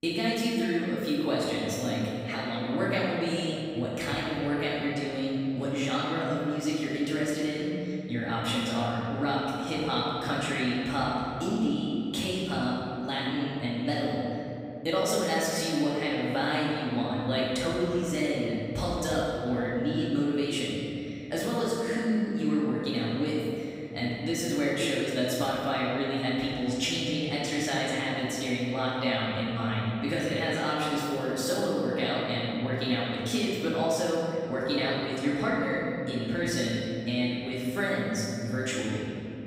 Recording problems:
room echo; strong; dies away in 2.5 s
off-mic speech; far

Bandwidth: 15.5 kHz